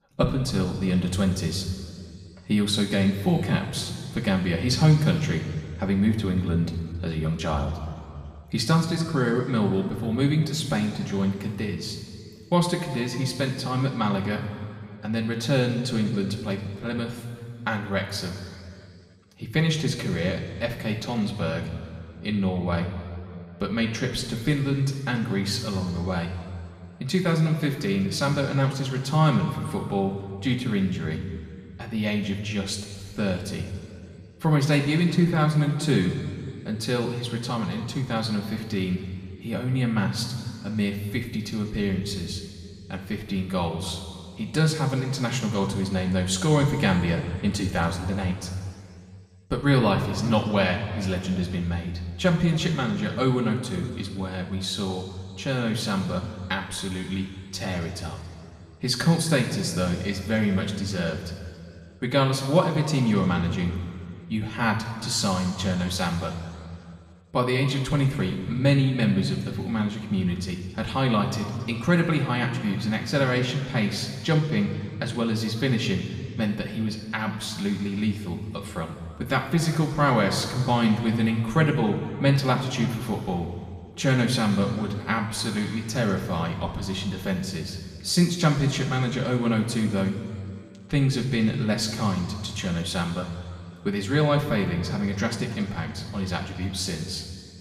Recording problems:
room echo; noticeable; dies away in 2 s
off-mic speech; somewhat distant

